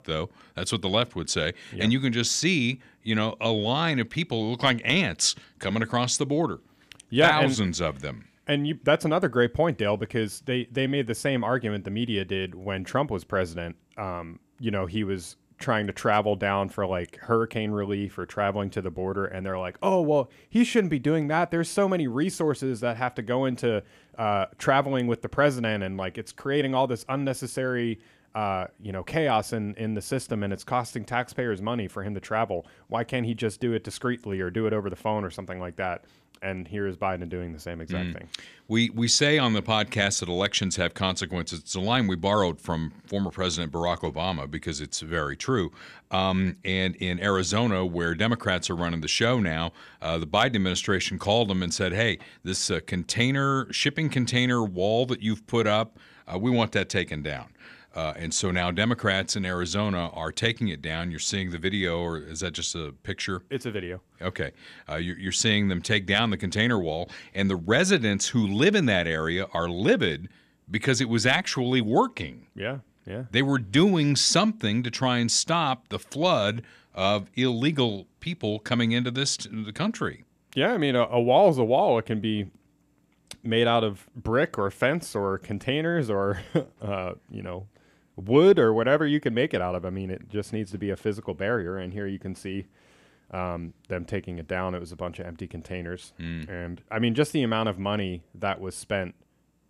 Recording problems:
none

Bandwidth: 14.5 kHz